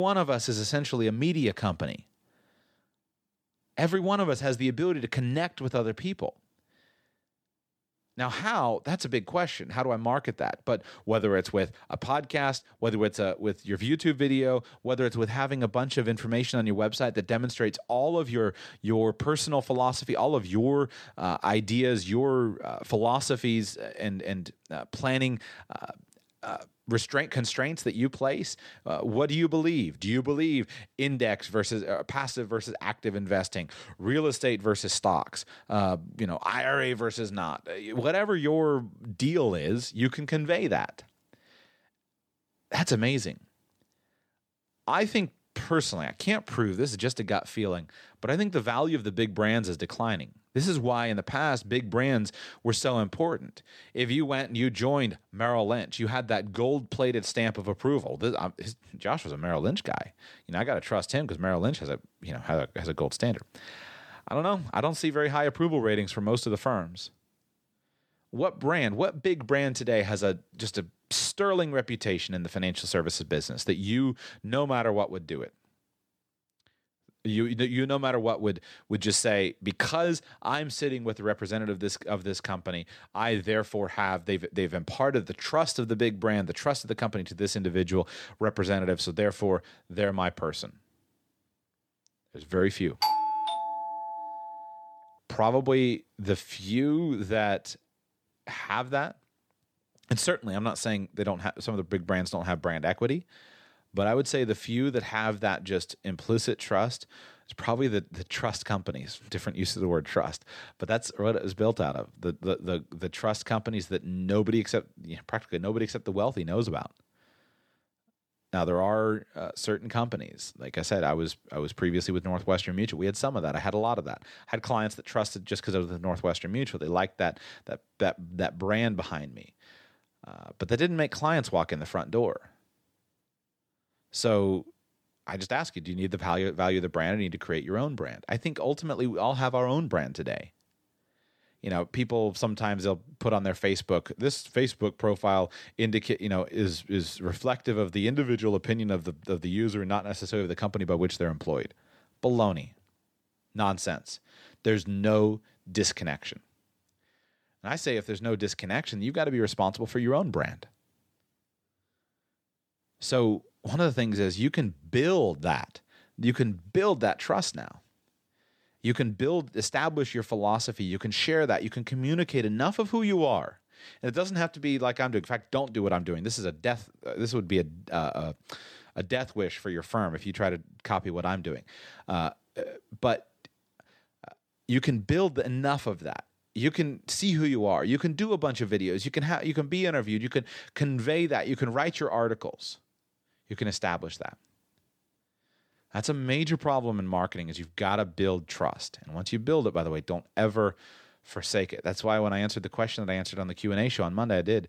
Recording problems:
abrupt cut into speech; at the start
doorbell; loud; from 1:33 to 1:35; peak 3 dB above the speech

